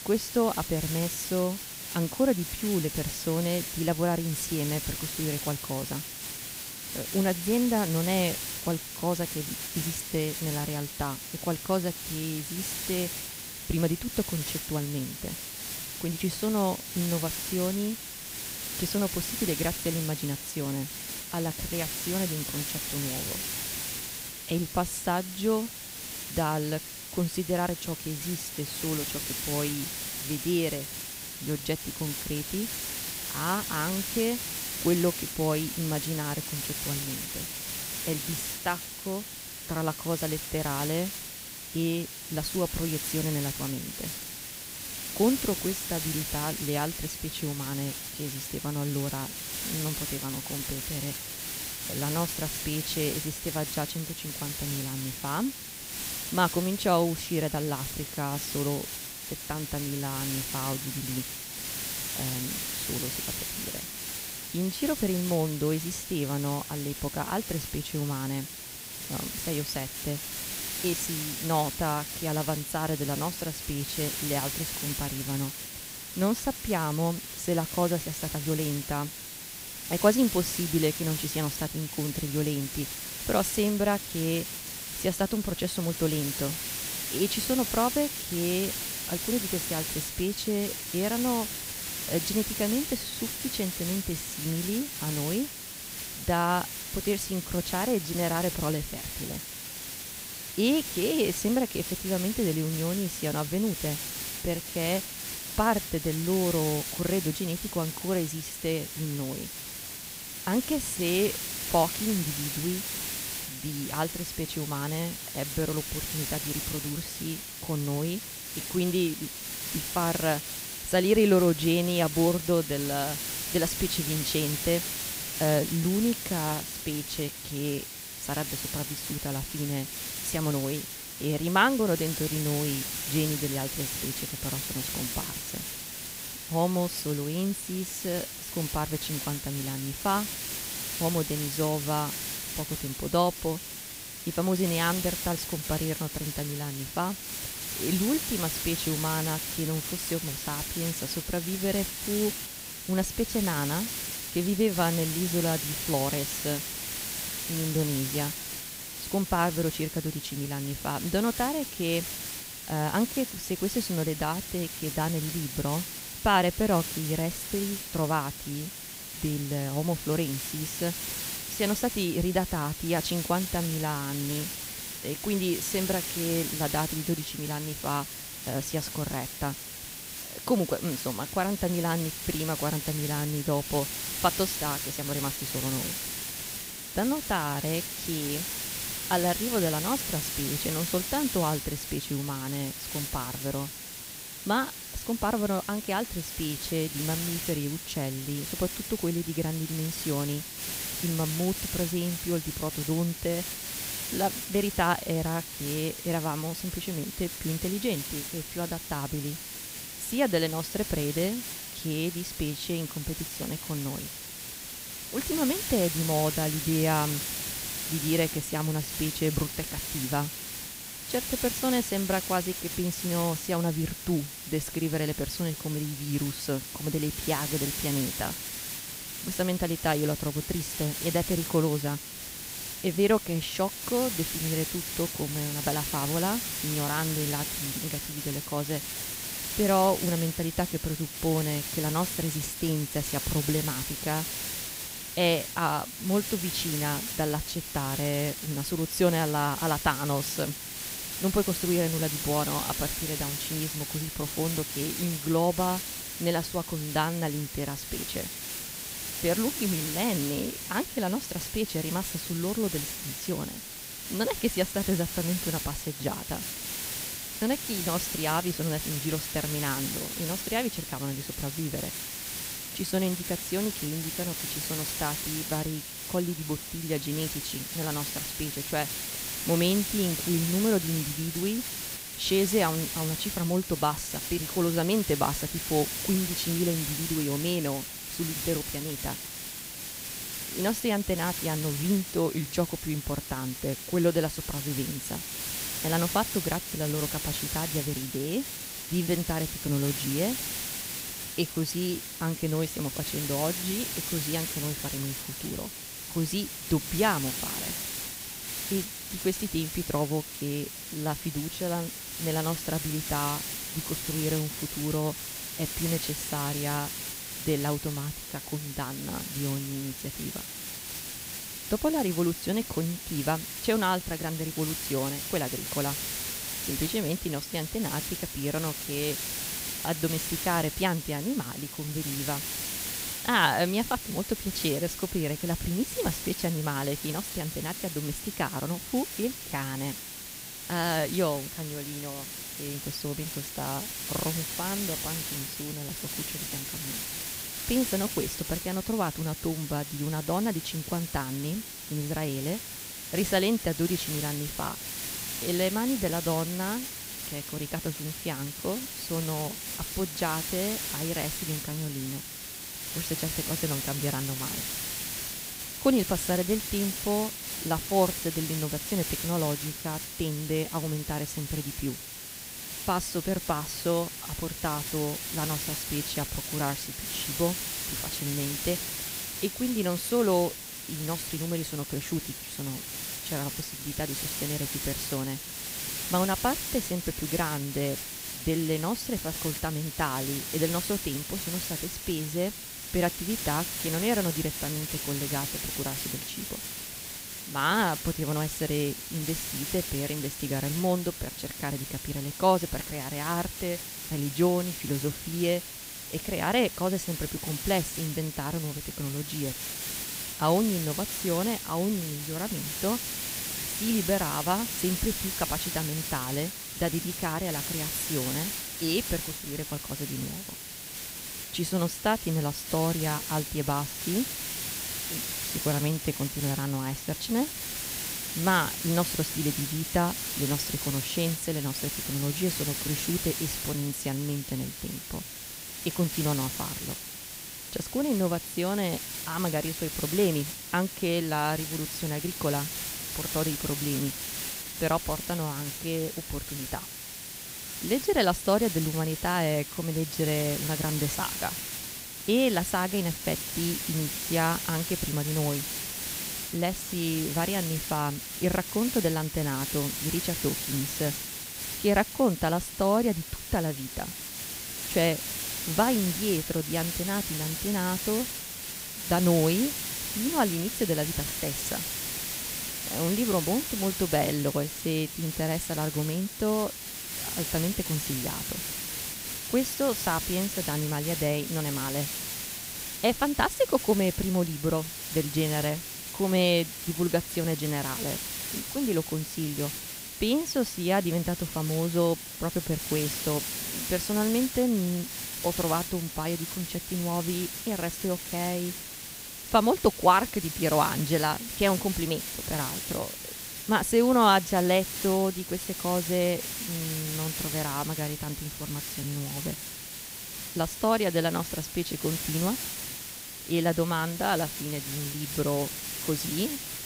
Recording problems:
hiss; loud; throughout; 3 dB below the speech

